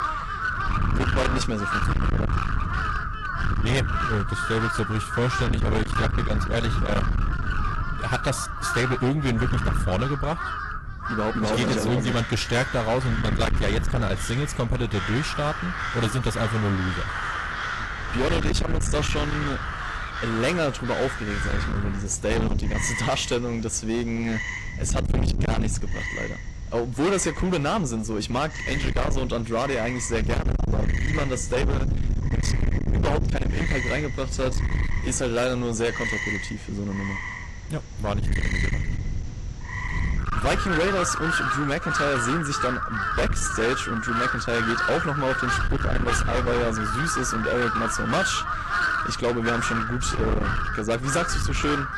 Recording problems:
distortion; heavy; 23% of the sound clipped
garbled, watery; slightly; nothing above 11.5 kHz
wind noise on the microphone; heavy; 7 dB below the speech
animal sounds; loud; throughout; 3 dB below the speech

